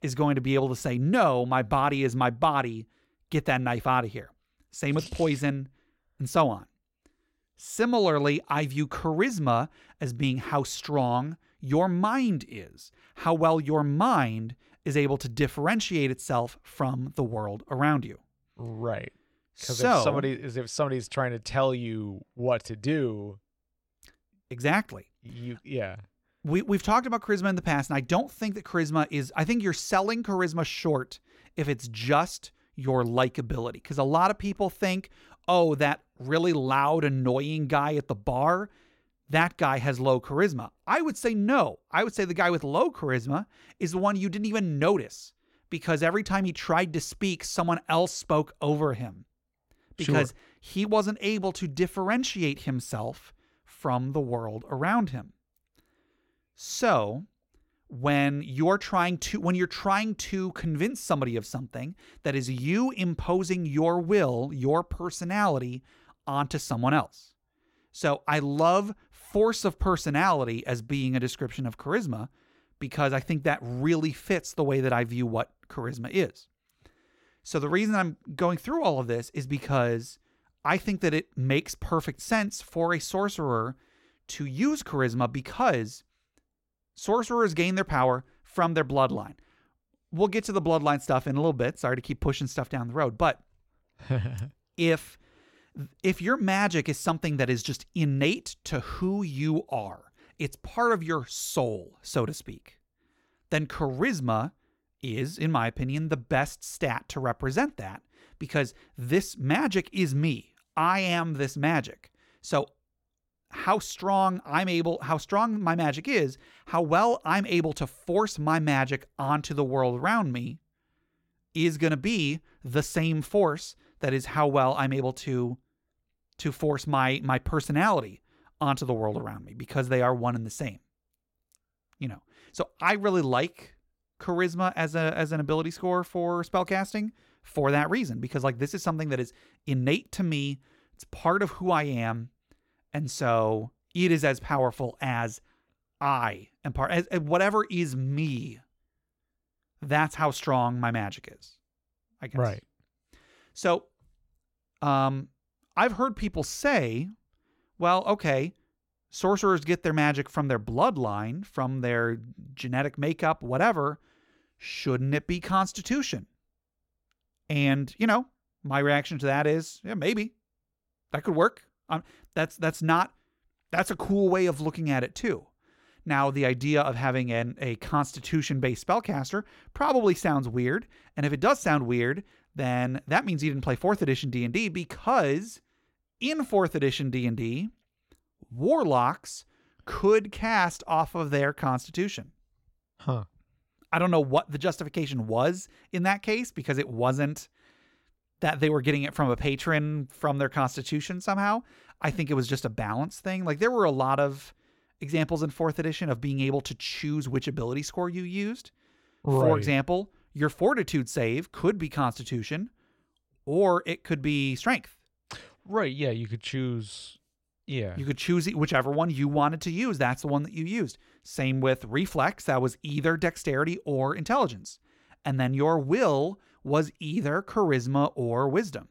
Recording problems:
none

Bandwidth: 16.5 kHz